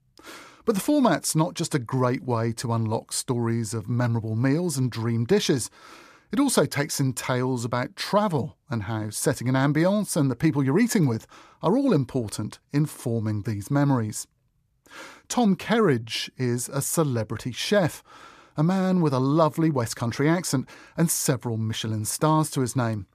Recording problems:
none

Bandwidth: 14.5 kHz